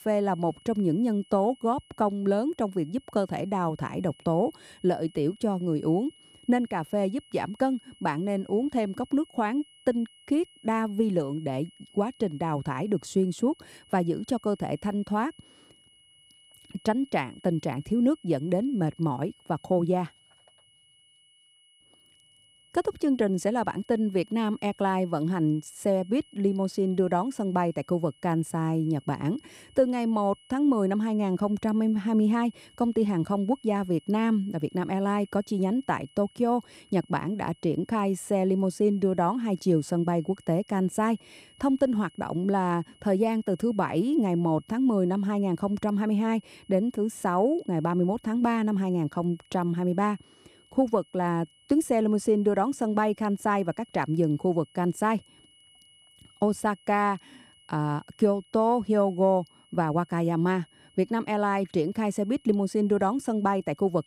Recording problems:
high-pitched whine; faint; throughout; 3 kHz, 30 dB below the speech

